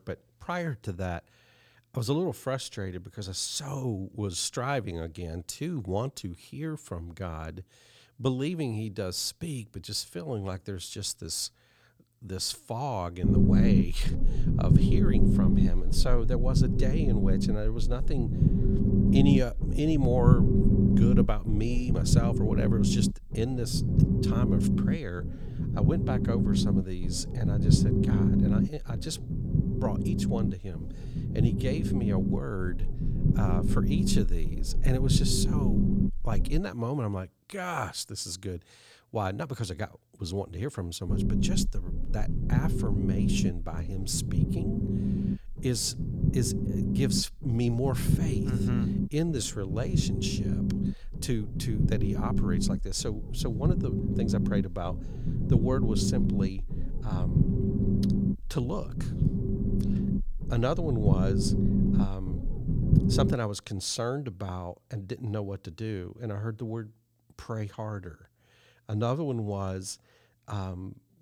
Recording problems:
low rumble; loud; from 13 to 37 s and from 41 s to 1:03; as loud as the speech

